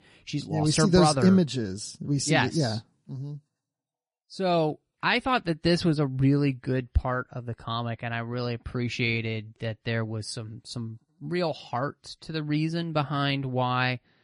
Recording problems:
garbled, watery; slightly; nothing above 10.5 kHz

